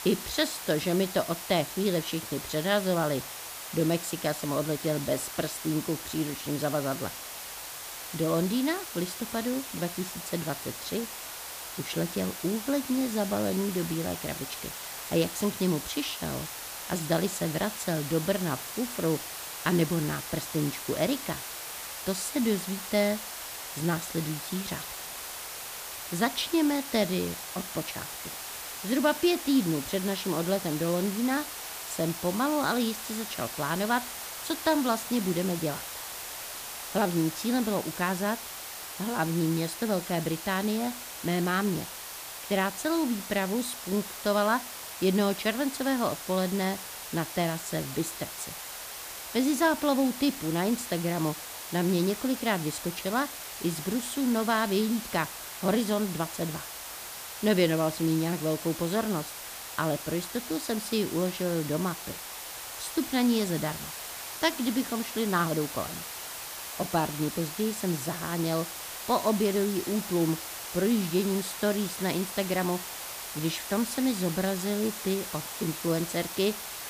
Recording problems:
hiss; loud; throughout; 7 dB below the speech

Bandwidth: 15 kHz